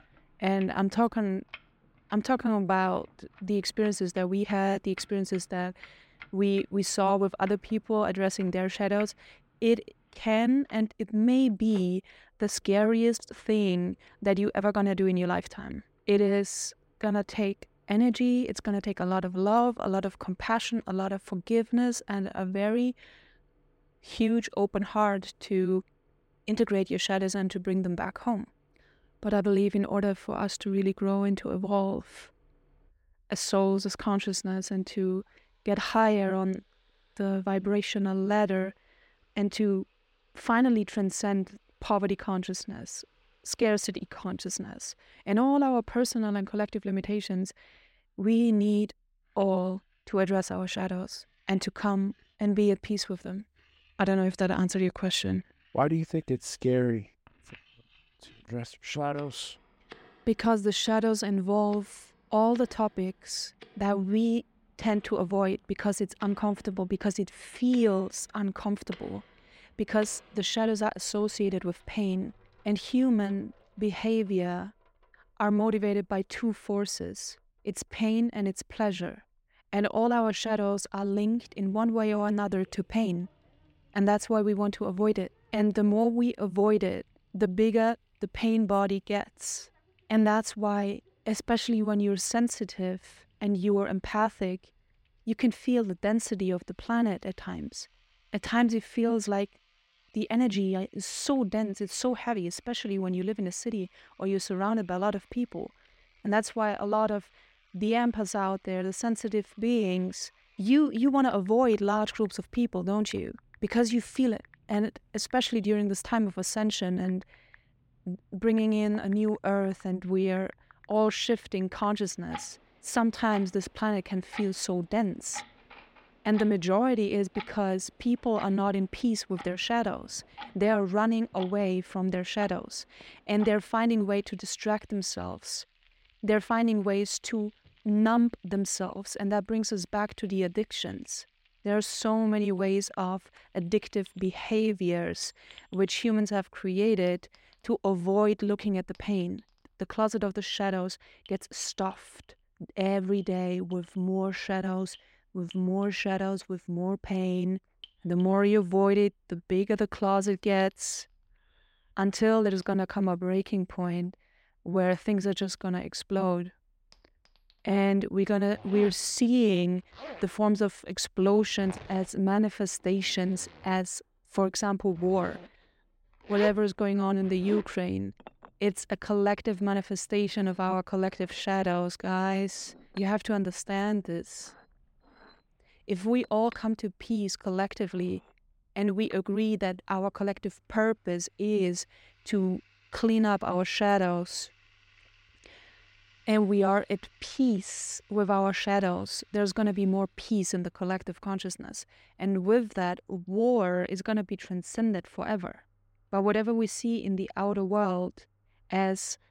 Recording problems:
household noises; faint; throughout; 25 dB below the speech

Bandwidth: 16 kHz